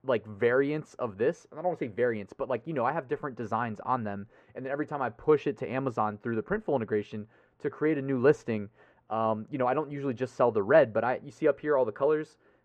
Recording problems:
muffled; very; fading above 3 kHz

